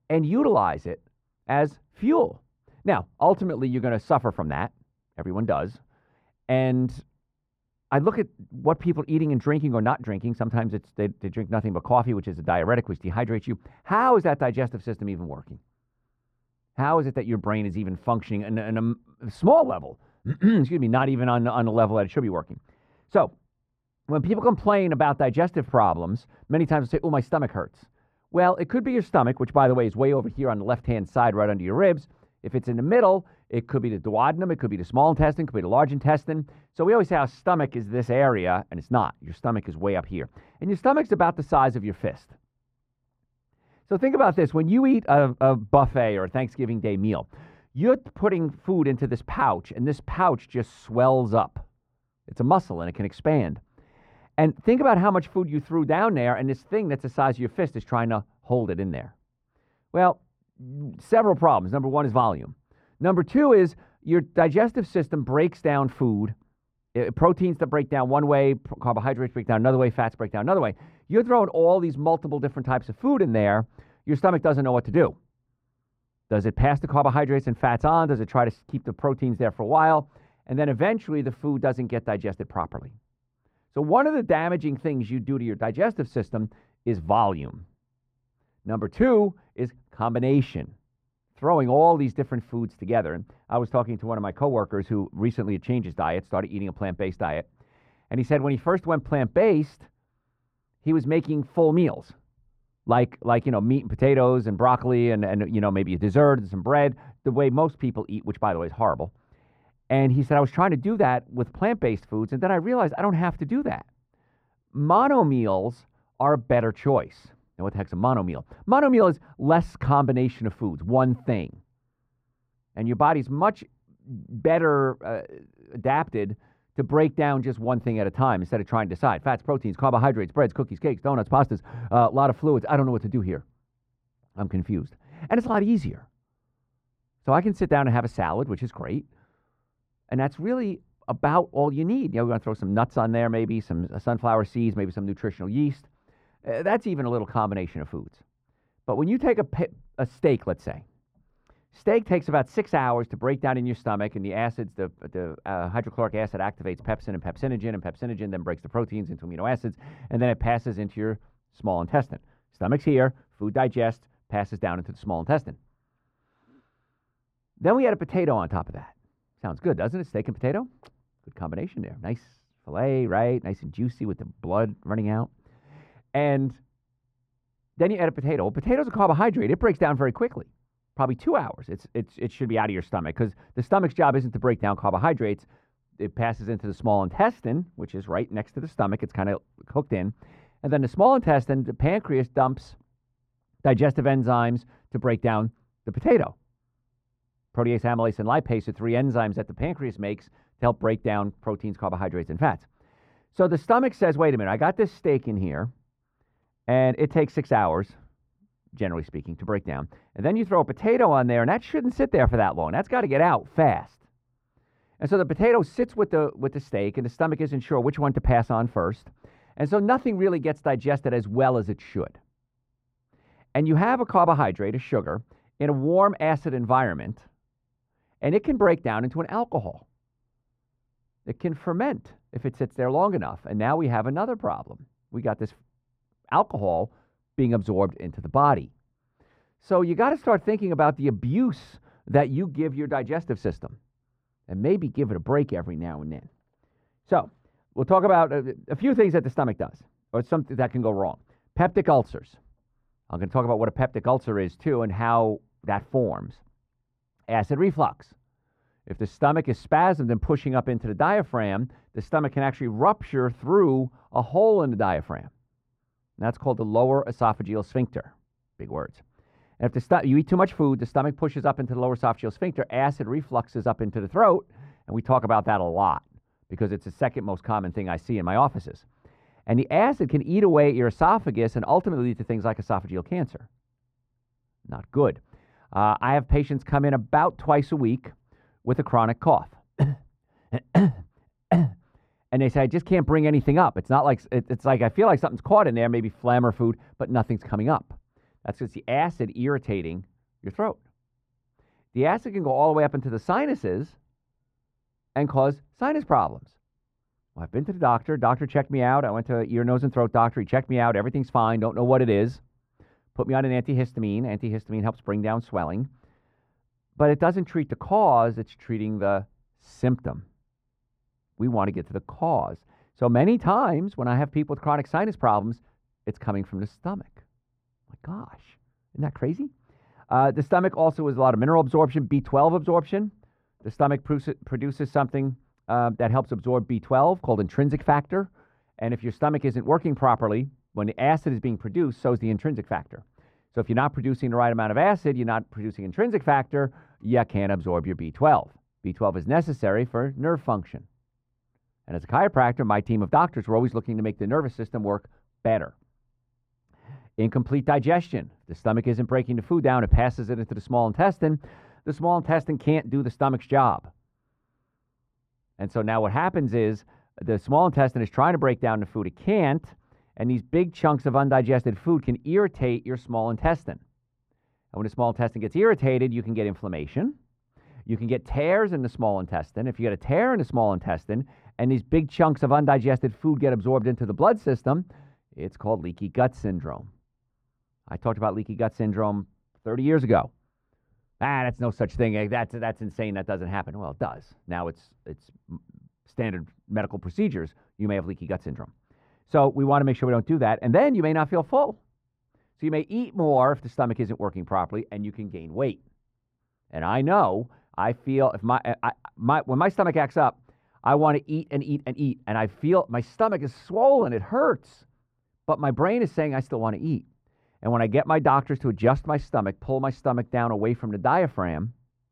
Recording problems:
muffled; very; fading above 2.5 kHz

